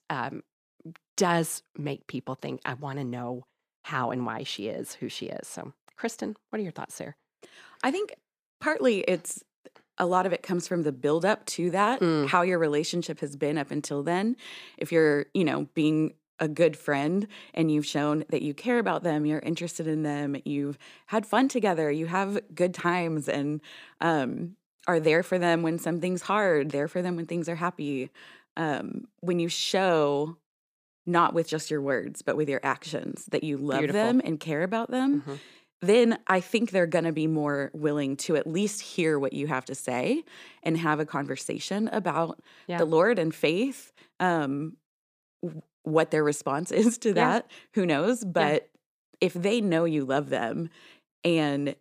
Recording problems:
none

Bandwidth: 15 kHz